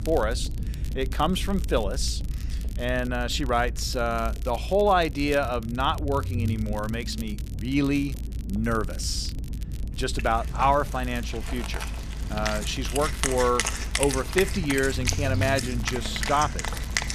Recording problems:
background music; loud; from 10 s on; 5 dB below the speech
low rumble; faint; throughout; 20 dB below the speech
crackle, like an old record; faint; 20 dB below the speech

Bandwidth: 14.5 kHz